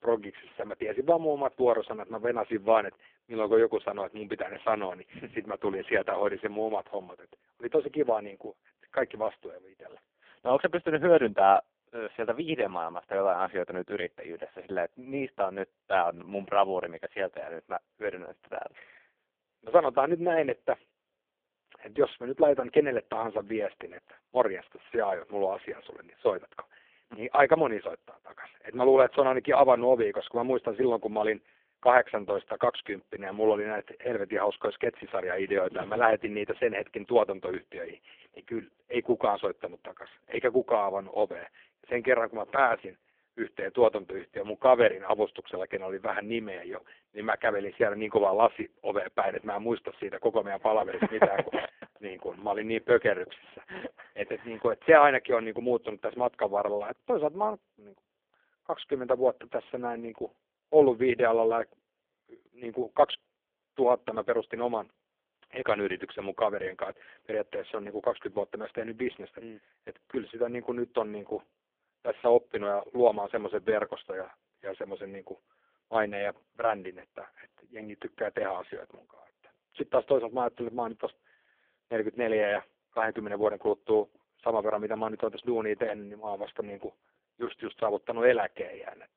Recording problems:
phone-call audio; poor line

